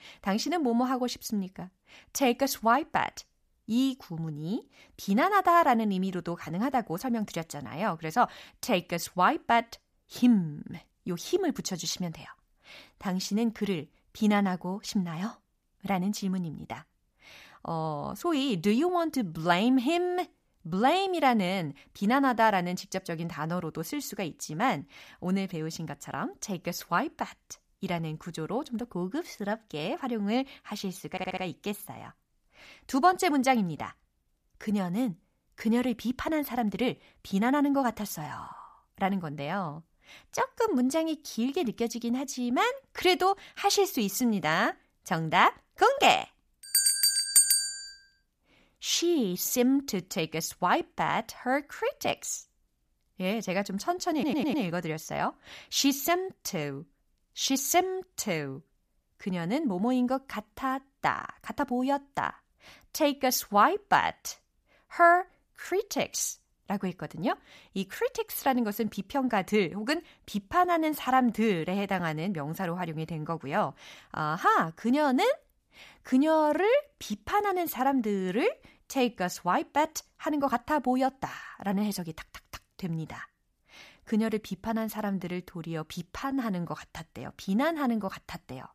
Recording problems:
audio stuttering; at 31 s and at 54 s

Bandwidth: 14.5 kHz